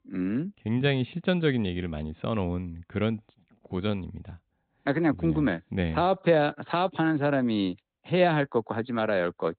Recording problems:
high frequencies cut off; severe; nothing above 4 kHz

